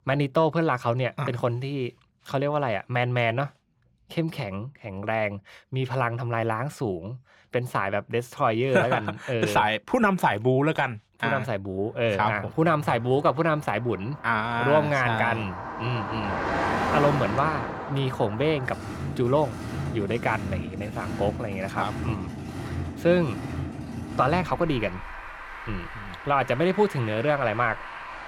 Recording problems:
traffic noise; loud; from 12 s on; 8 dB below the speech

